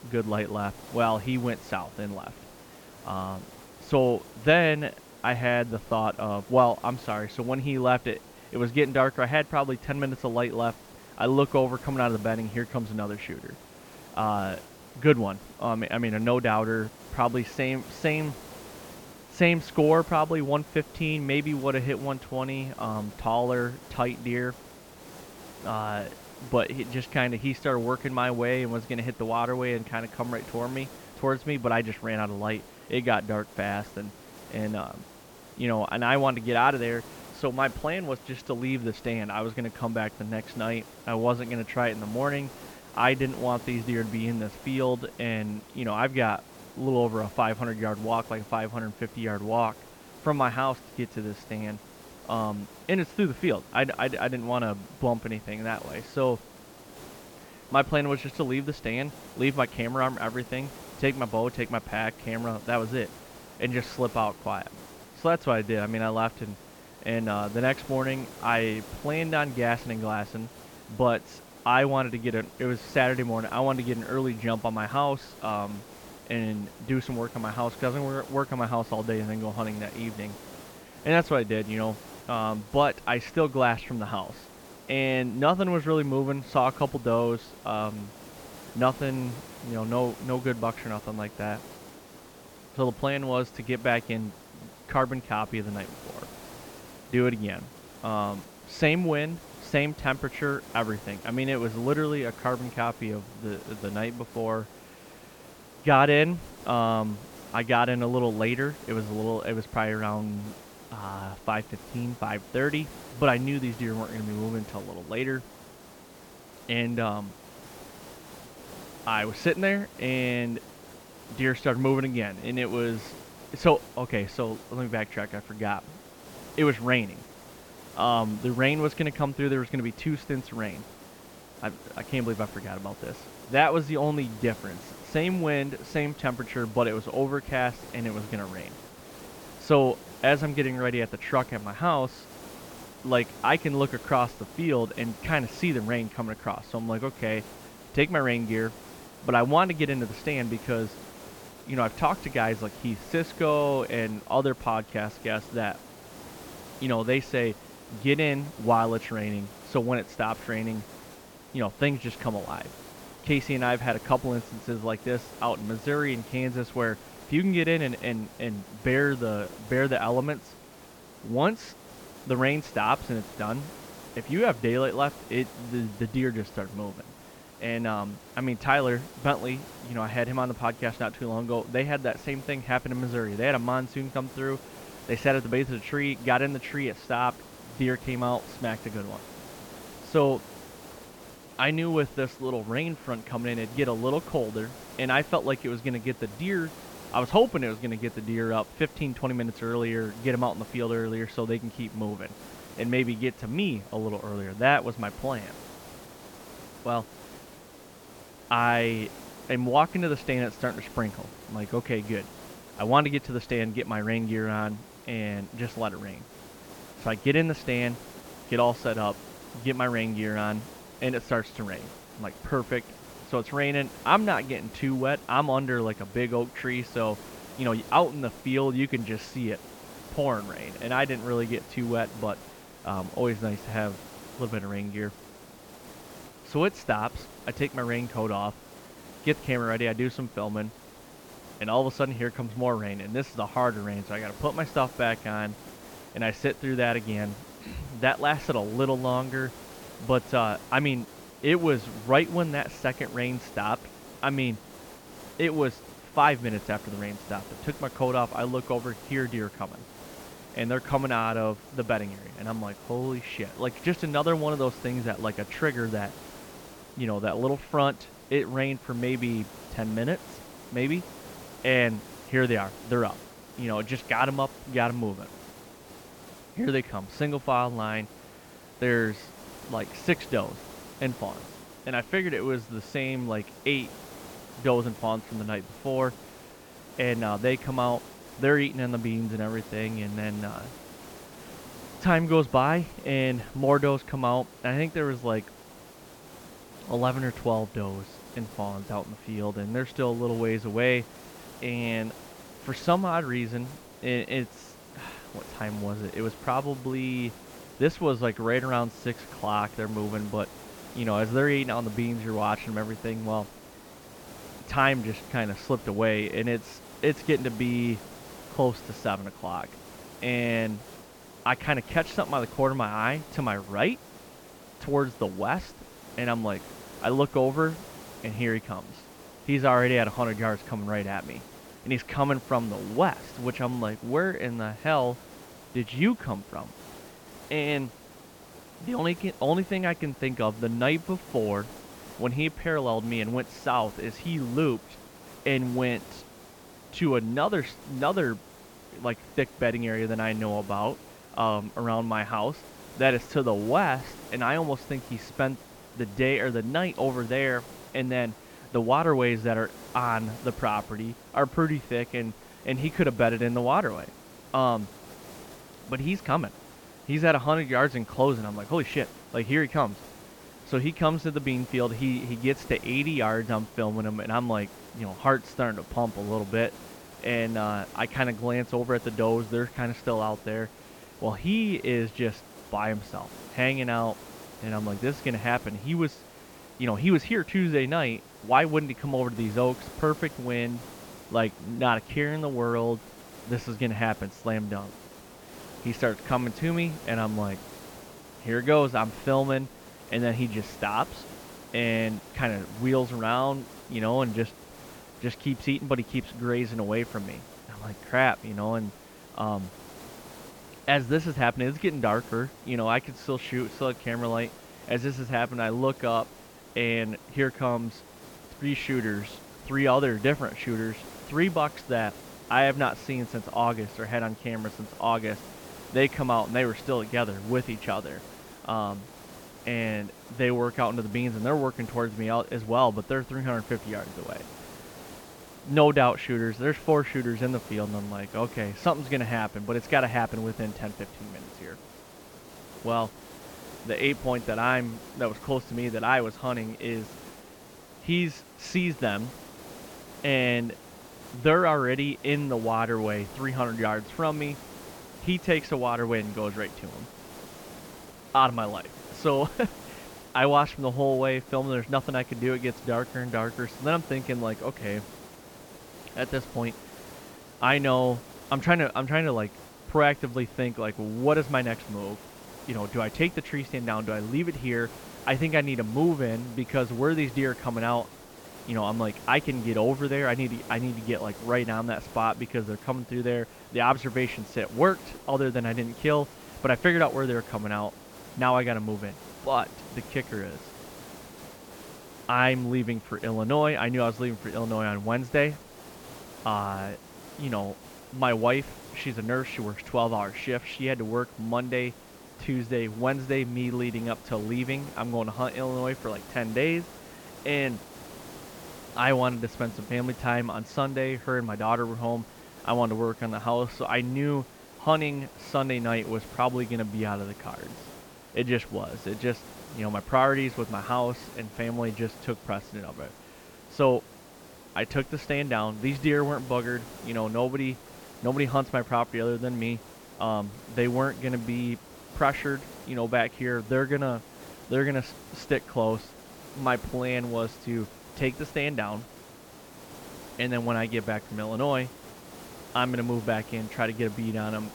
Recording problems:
muffled; slightly; fading above 2.5 kHz
hiss; noticeable; throughout; 15 dB below the speech

